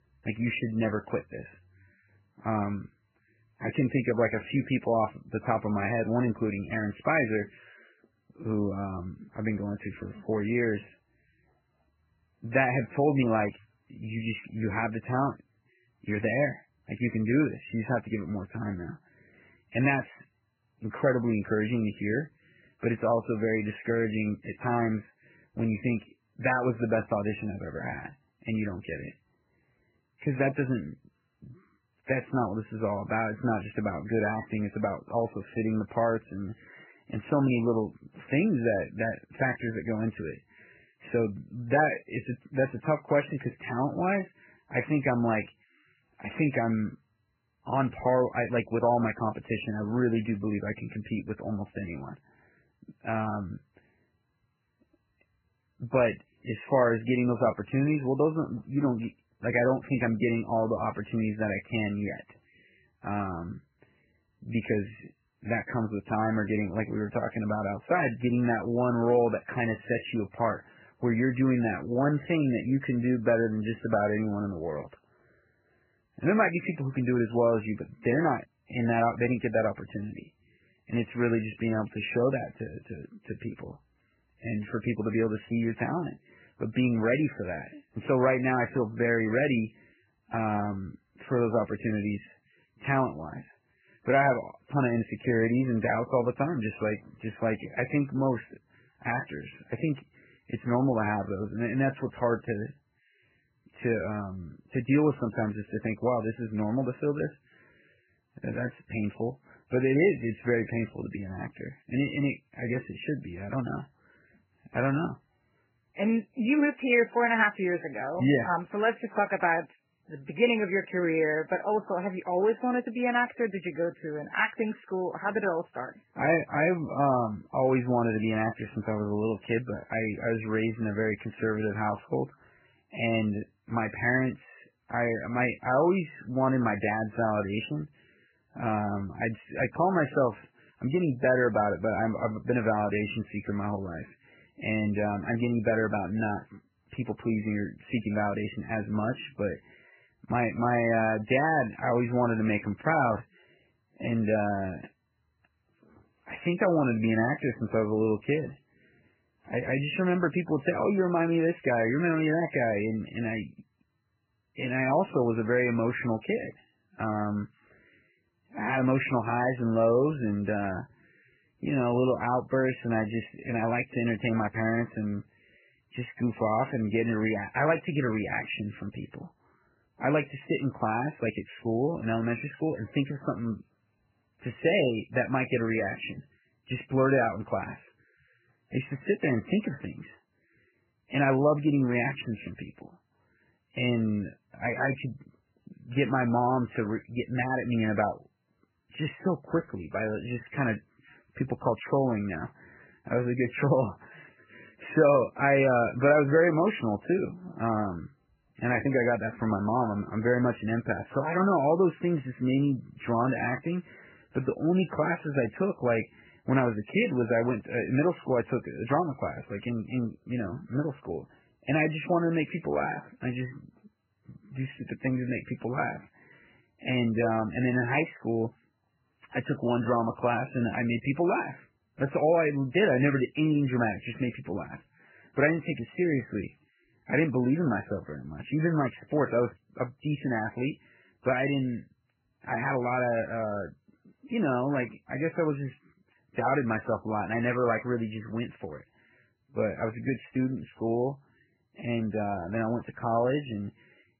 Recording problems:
garbled, watery; badly; nothing above 3 kHz

